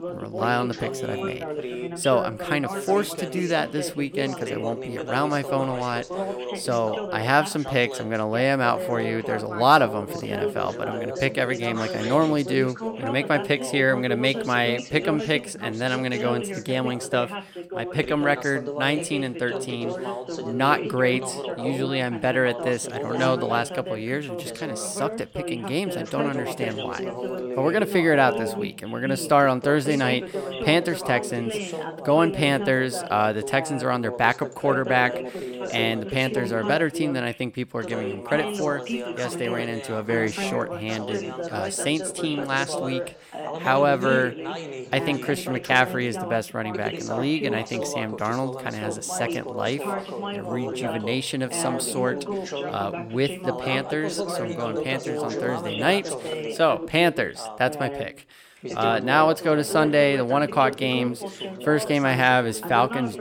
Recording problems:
background chatter; loud; throughout; 2 voices, 7 dB below the speech

